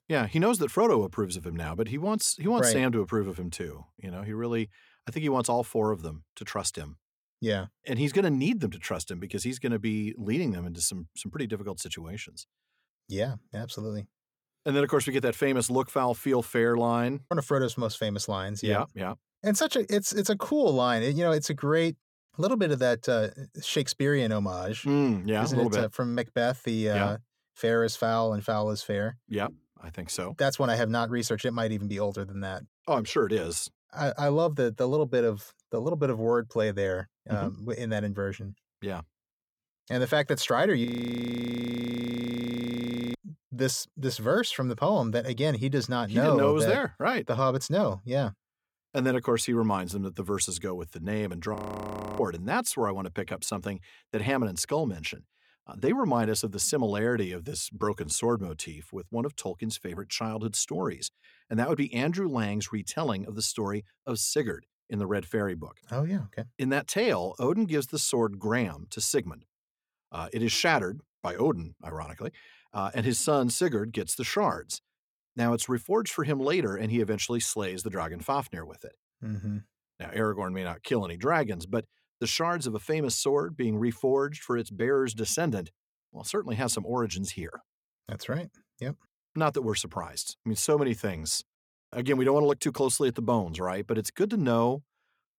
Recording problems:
audio freezing; at 41 s for 2.5 s and at 52 s for 0.5 s

